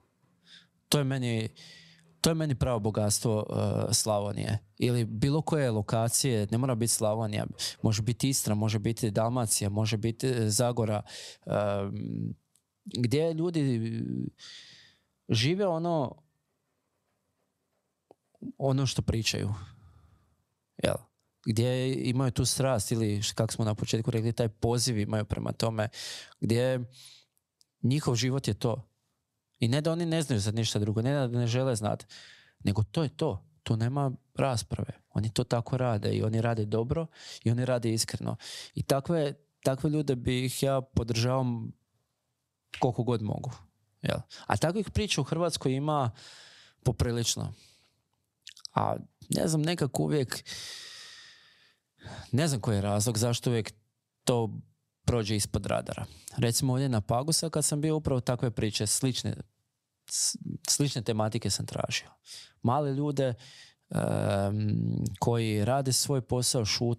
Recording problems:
squashed, flat; somewhat

